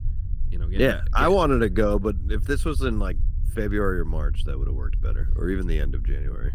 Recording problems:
low rumble; faint; throughout; 25 dB below the speech

